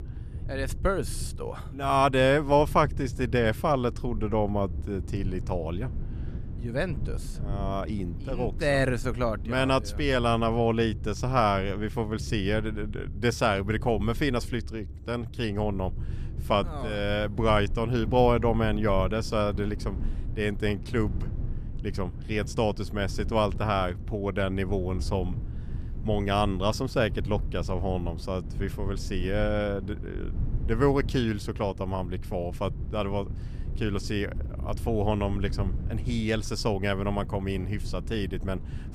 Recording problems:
low rumble; faint; throughout; 20 dB below the speech

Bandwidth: 14.5 kHz